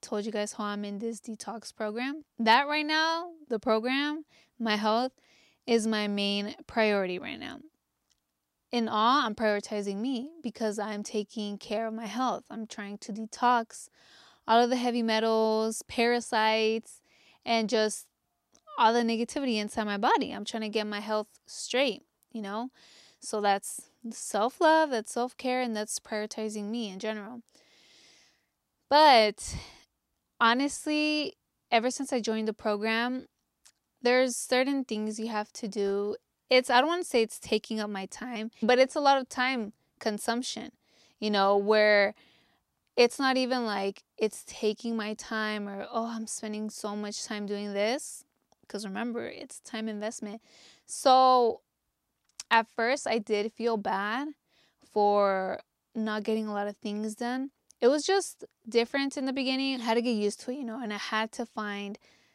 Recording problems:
none

